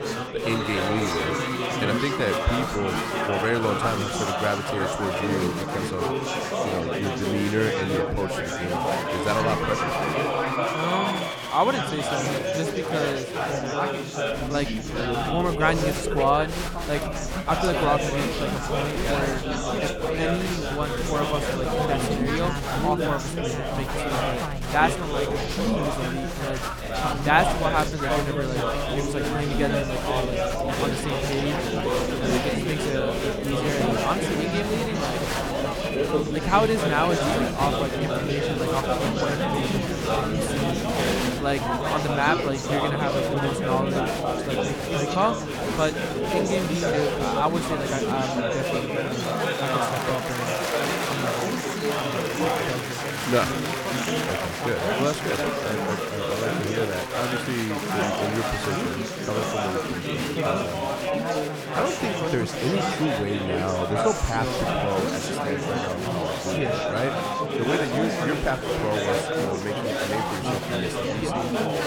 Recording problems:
chatter from many people; very loud; throughout; 3 dB above the speech

